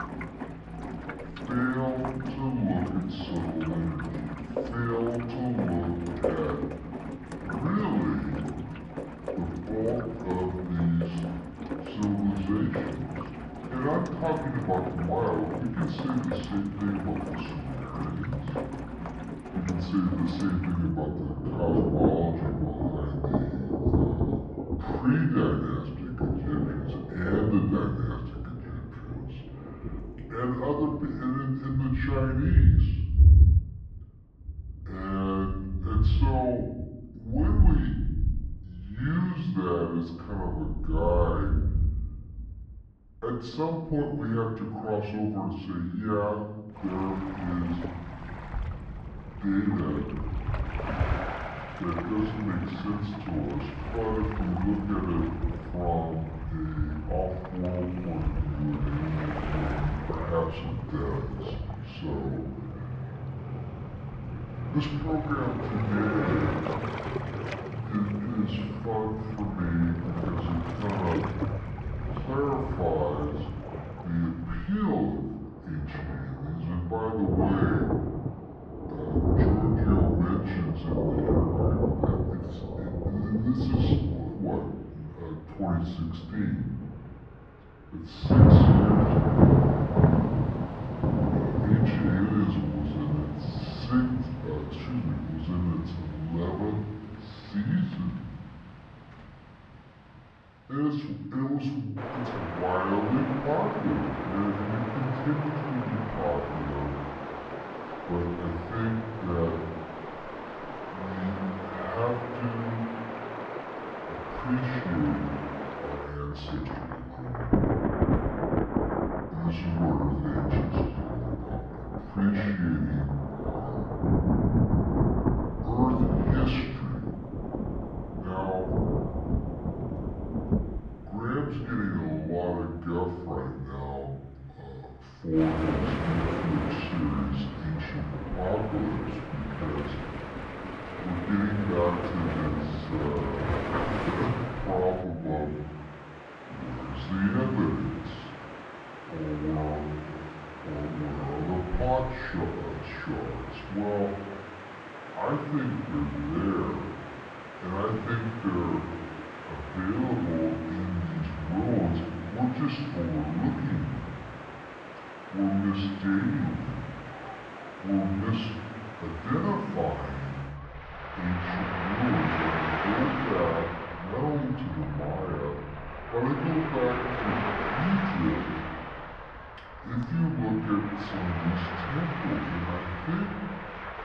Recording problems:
off-mic speech; far
muffled; very; fading above 2 kHz
wrong speed and pitch; too slow and too low; 0.7 times normal speed
room echo; noticeable; dies away in 0.9 s
rain or running water; loud; throughout; 1 dB below the speech

